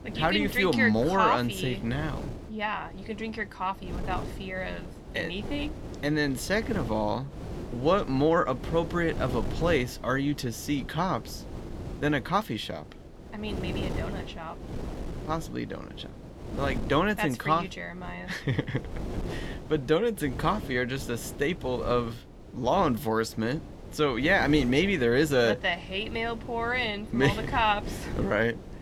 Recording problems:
wind noise on the microphone; occasional gusts; 15 dB below the speech

